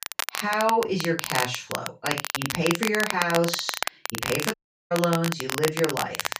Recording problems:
off-mic speech; far
room echo; slight; dies away in 0.2 s
crackle, like an old record; loud; 3 dB below the speech
audio cutting out; at 4.5 s

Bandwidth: 15 kHz